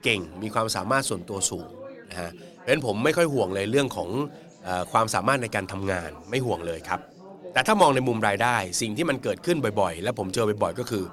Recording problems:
chatter from many people; faint; throughout; 20 dB below the speech

